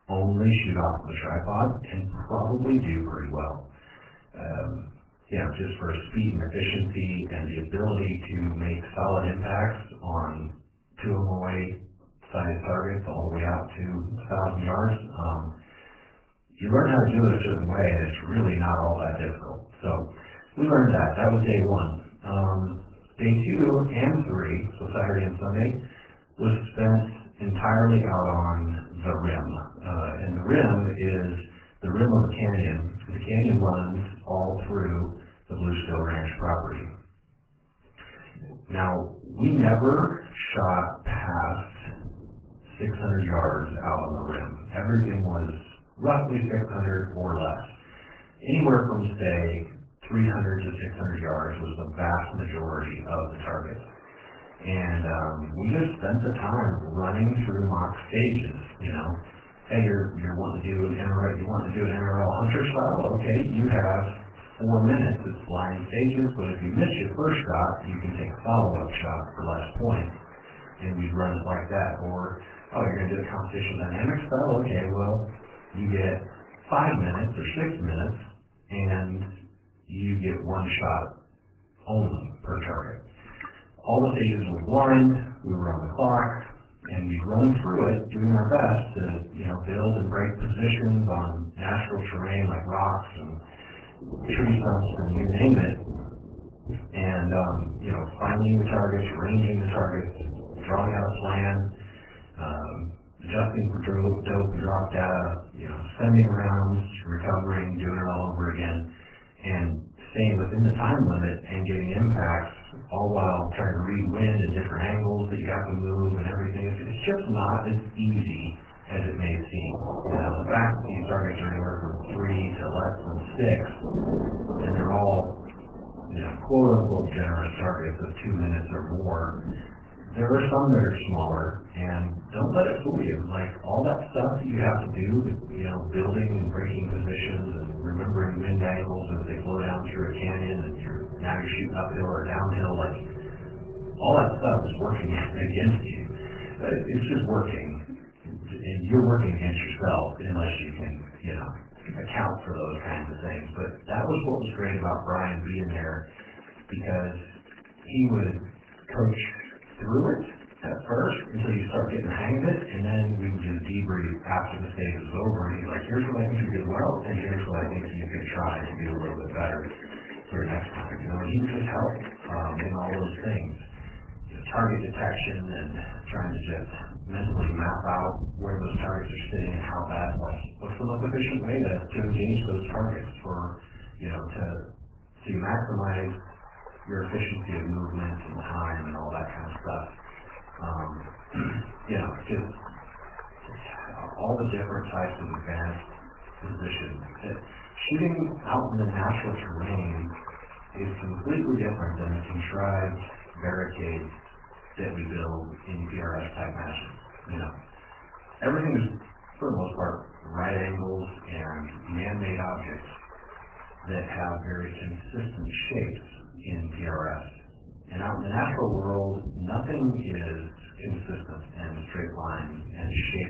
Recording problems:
off-mic speech; far
garbled, watery; badly; nothing above 3 kHz
room echo; slight; dies away in 0.4 s
rain or running water; noticeable; throughout; 15 dB below the speech

